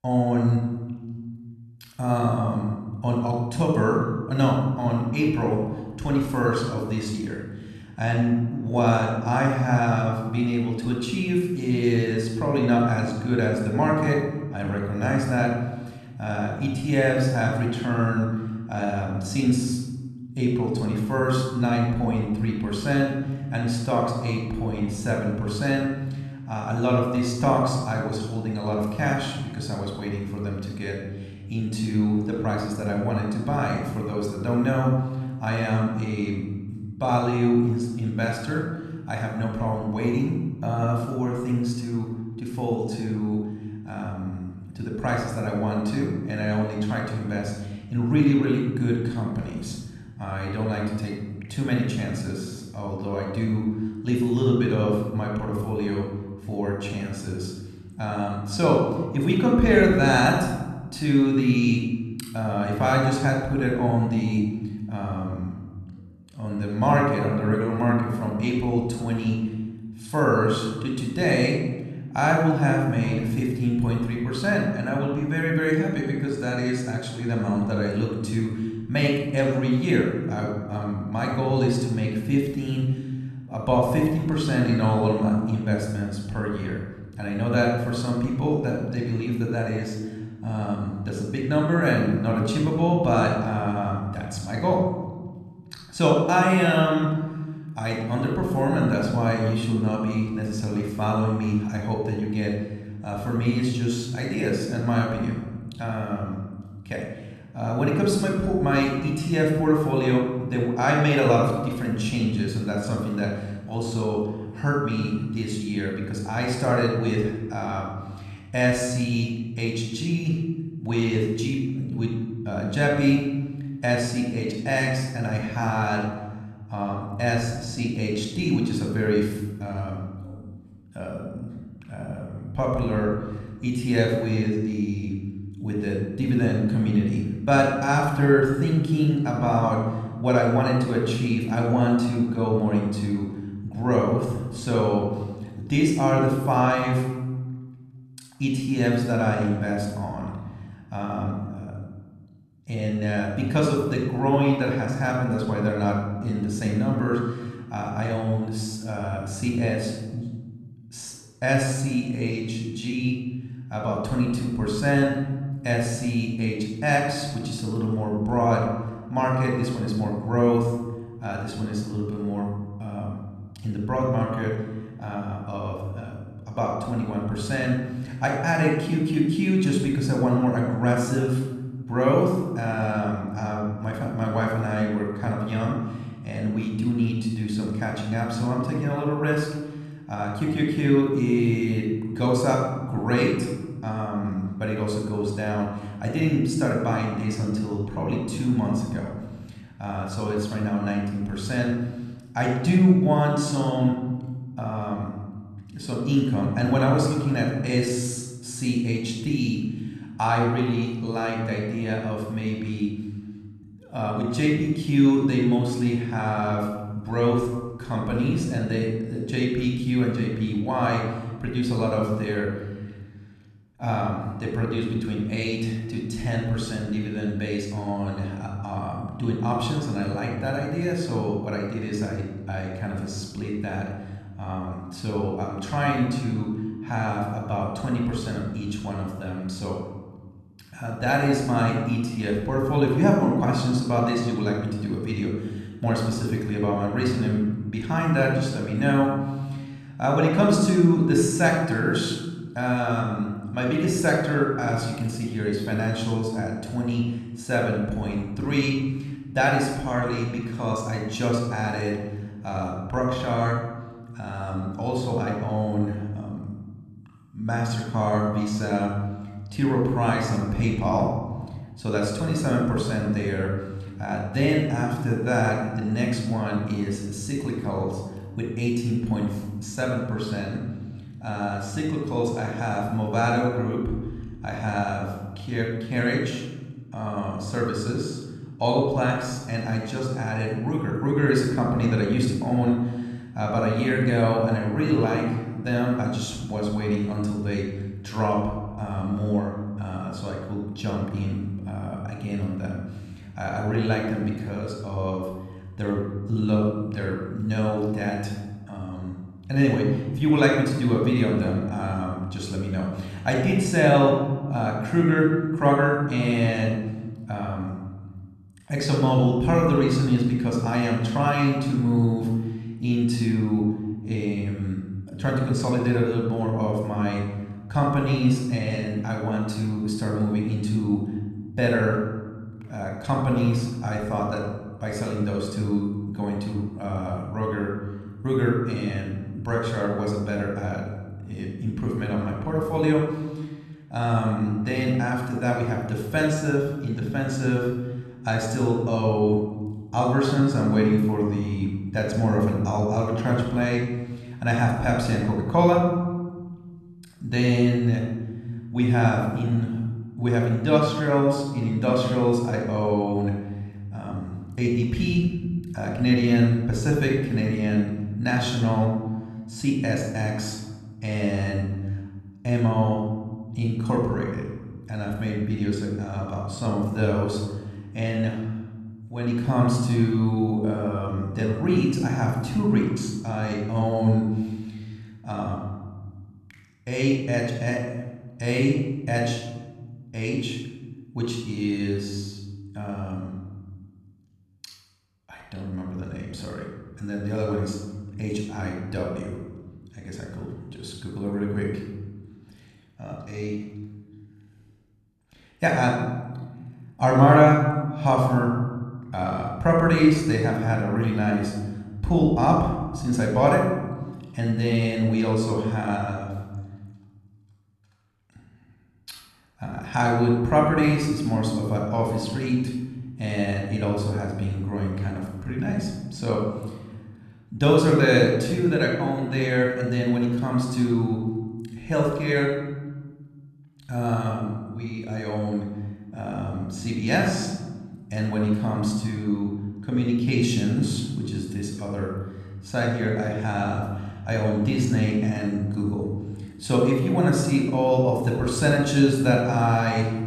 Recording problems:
room echo; noticeable; dies away in 1.4 s
off-mic speech; somewhat distant

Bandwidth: 14 kHz